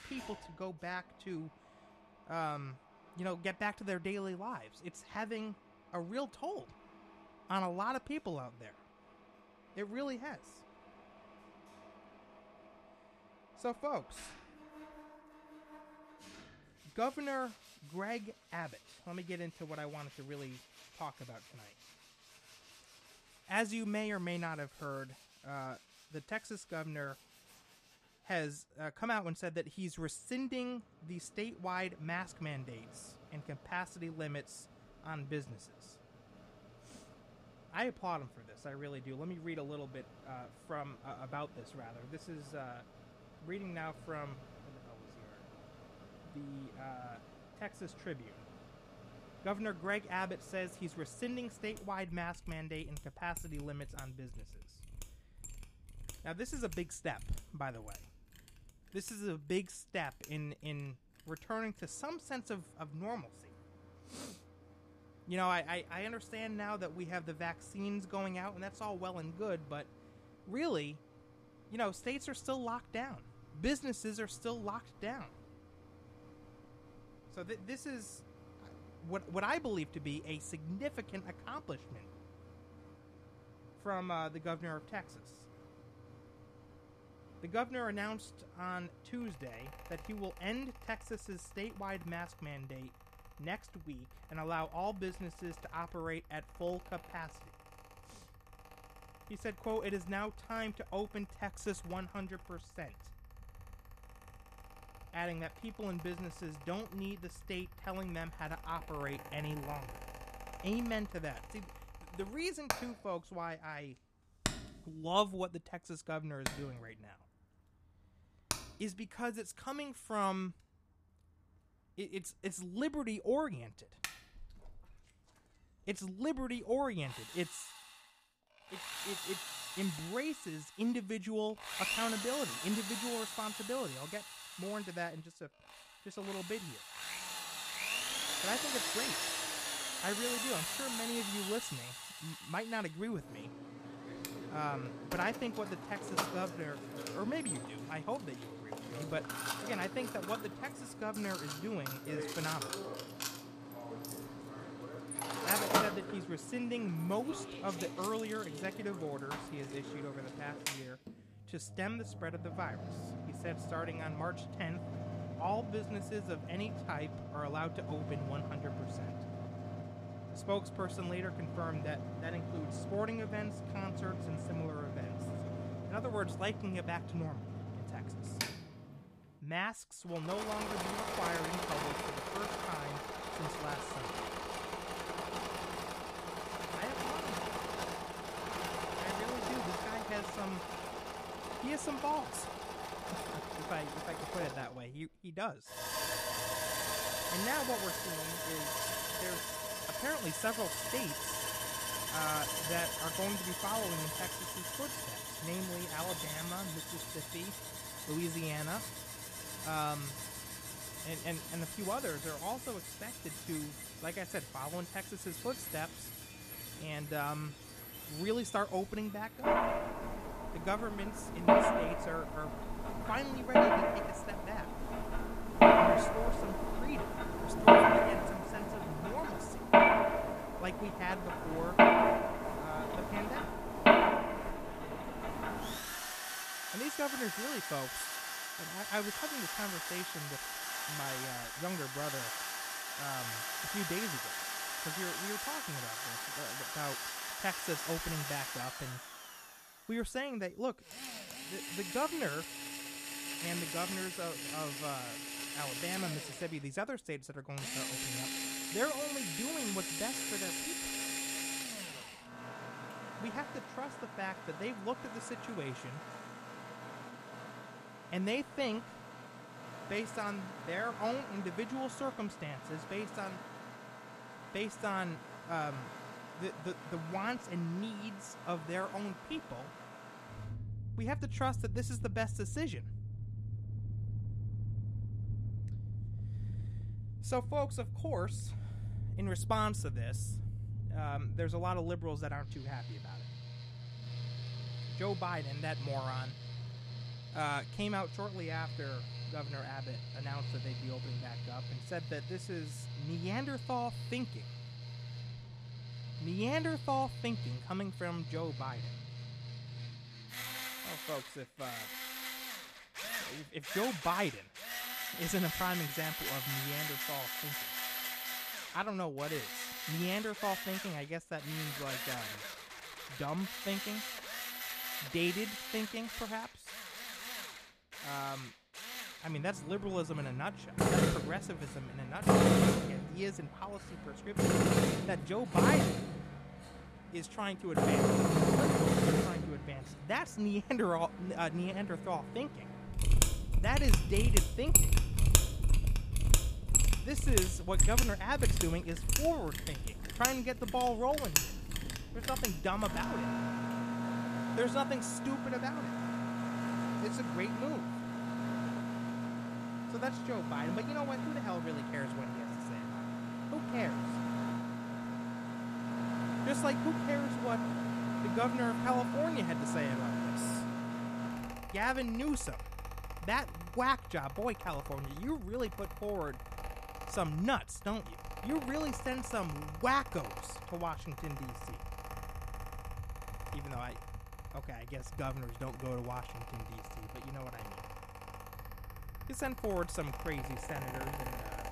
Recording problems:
machinery noise; very loud; throughout; 3 dB above the speech

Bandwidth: 14.5 kHz